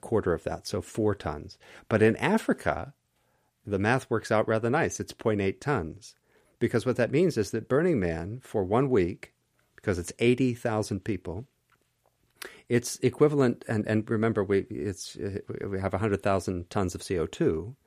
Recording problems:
none

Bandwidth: 14.5 kHz